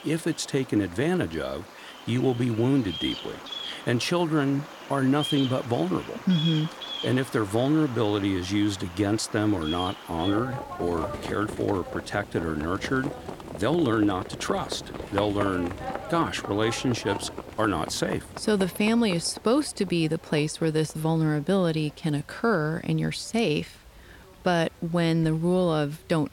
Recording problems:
animal sounds; noticeable; throughout; 10 dB below the speech
hiss; faint; throughout; 30 dB below the speech

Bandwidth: 17 kHz